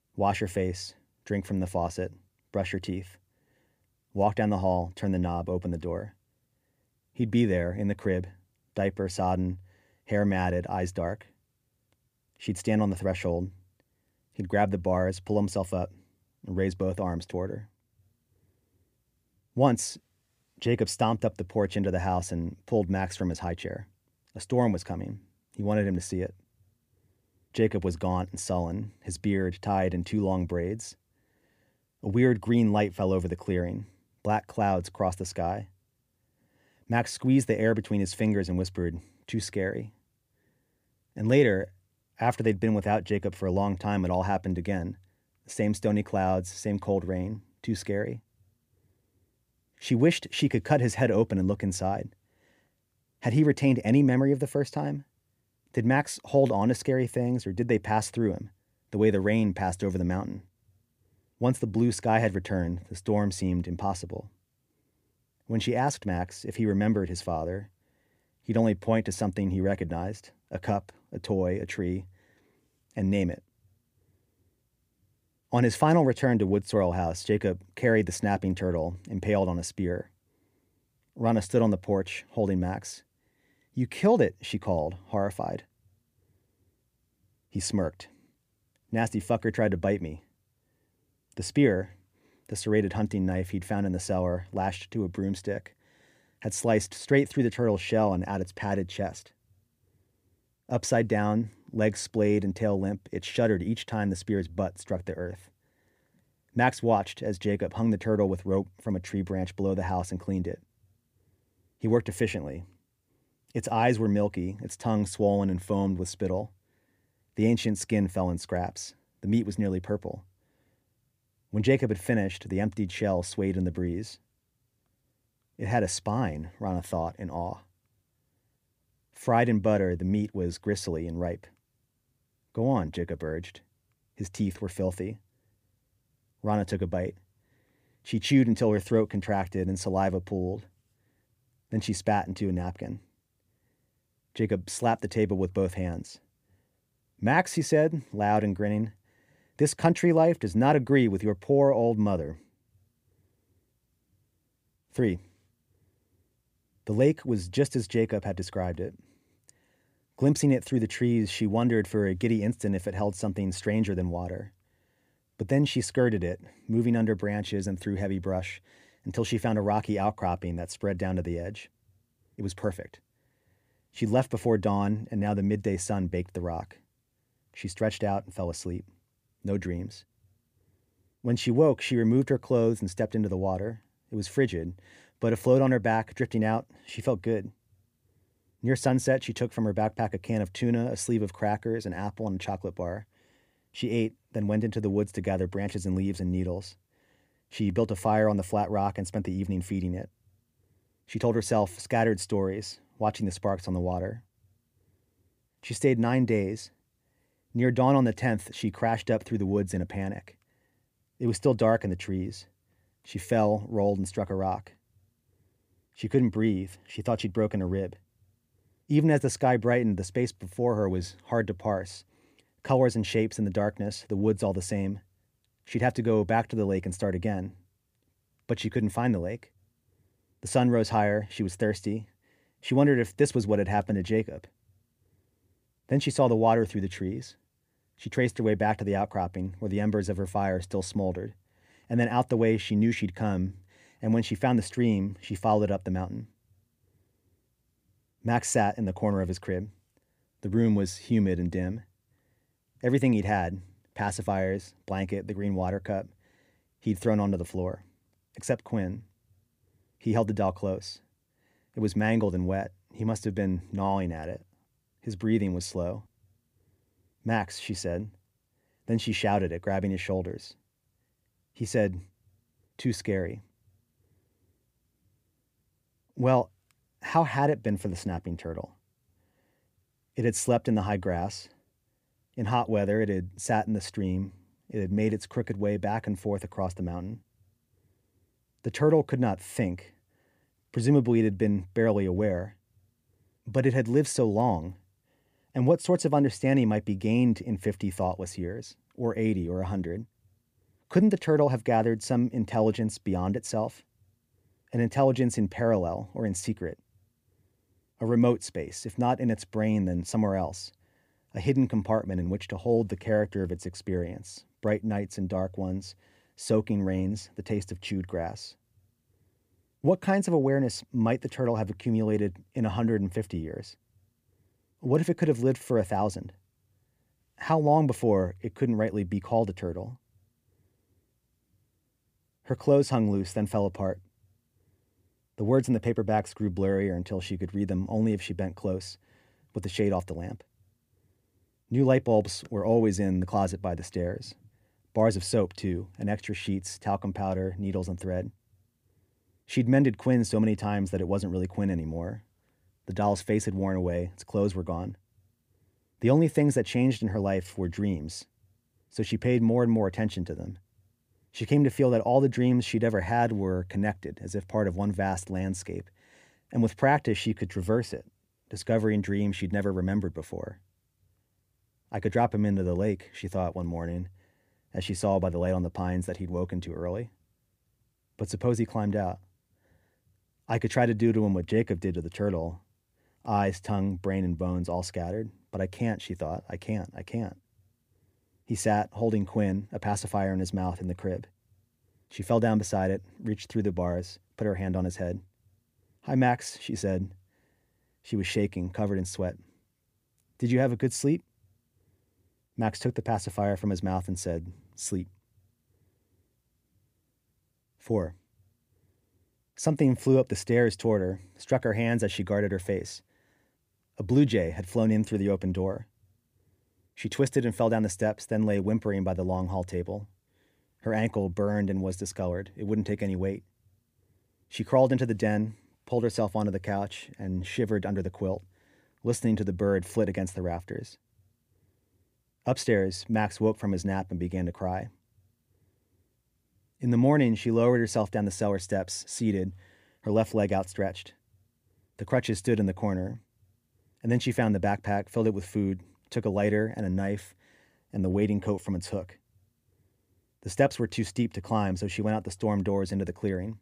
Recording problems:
none

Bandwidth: 15 kHz